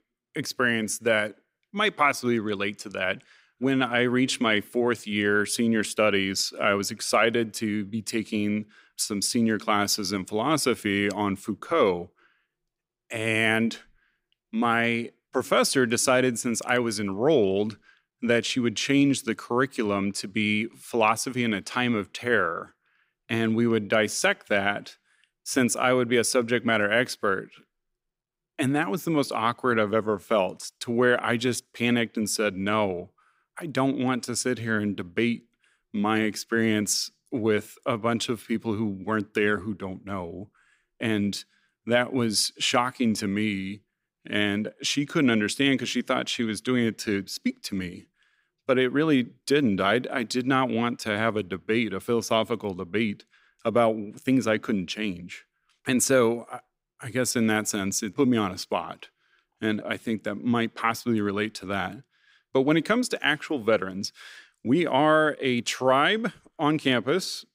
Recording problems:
none

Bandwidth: 15.5 kHz